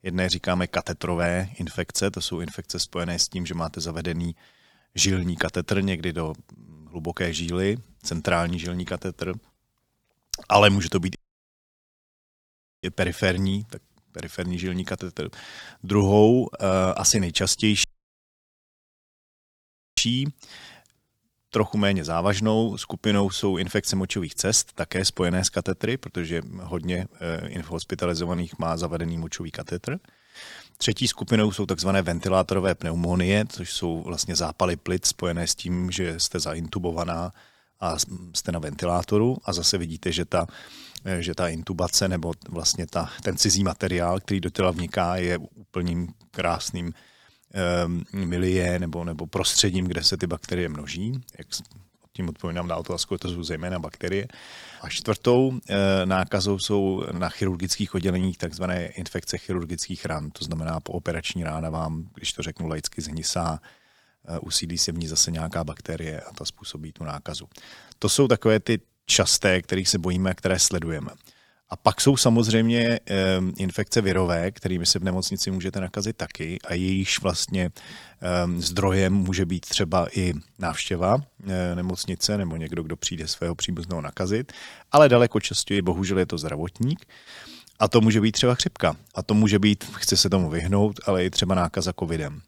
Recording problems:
audio cutting out; at 11 s for 1.5 s and at 18 s for 2 s

